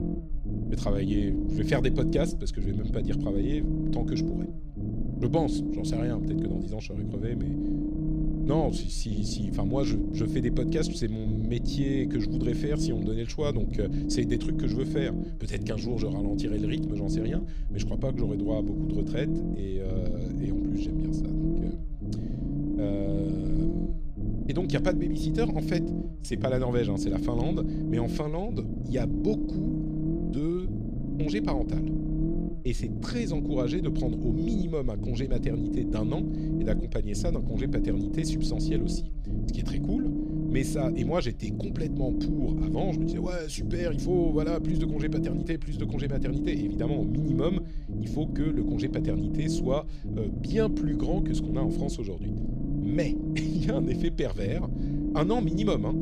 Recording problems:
low rumble; loud; throughout; 1 dB below the speech

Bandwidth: 14.5 kHz